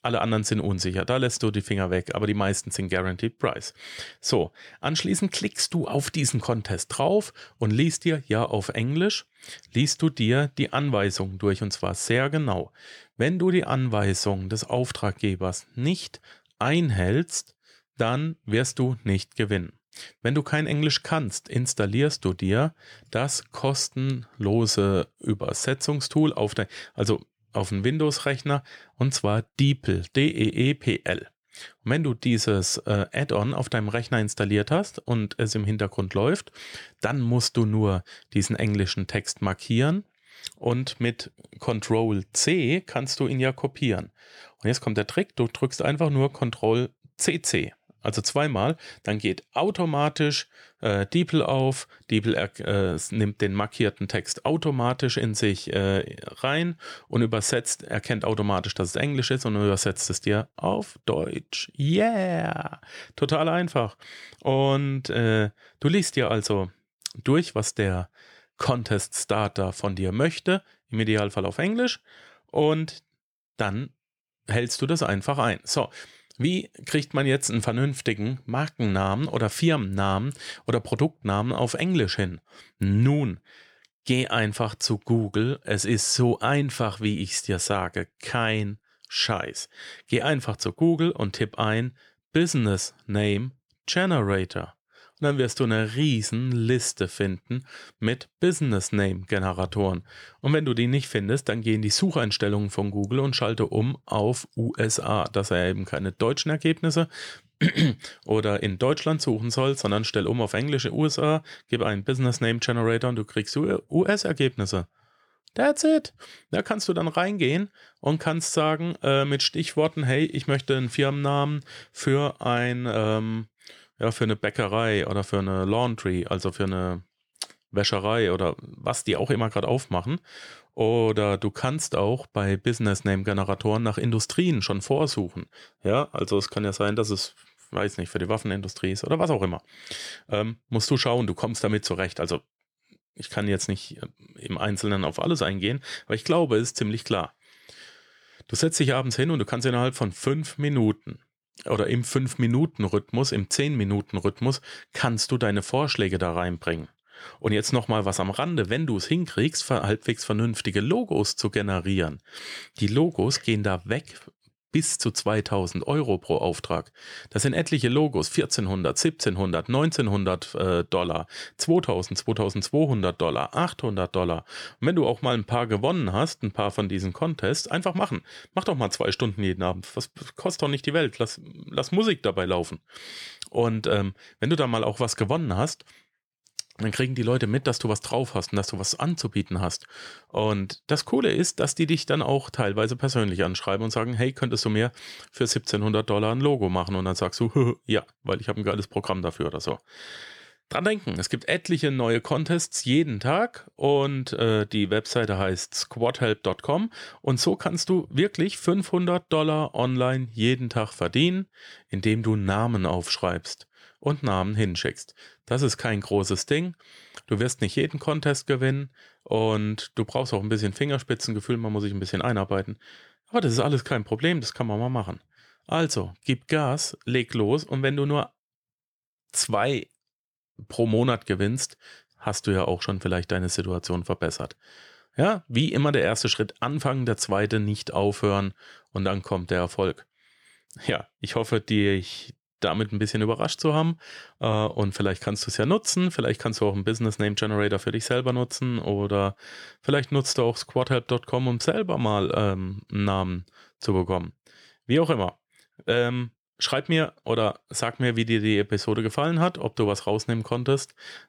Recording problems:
none

